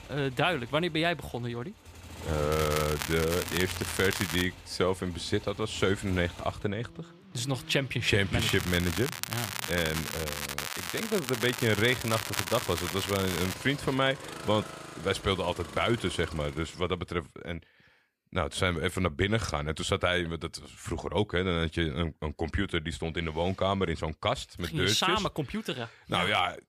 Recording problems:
crackling; loud; from 2.5 to 4.5 s, from 8.5 to 11 s and from 11 to 14 s; 5 dB below the speech
traffic noise; noticeable; until 17 s; 15 dB below the speech

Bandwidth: 15 kHz